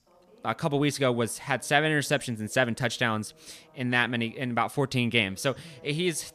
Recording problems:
voice in the background; faint; throughout; 30 dB below the speech

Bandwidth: 14.5 kHz